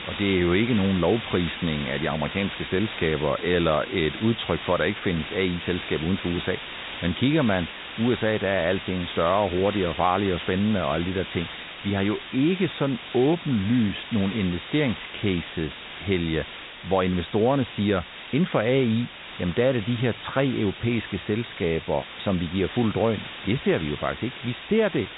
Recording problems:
high frequencies cut off; severe; nothing above 4 kHz
hiss; noticeable; throughout; 10 dB below the speech

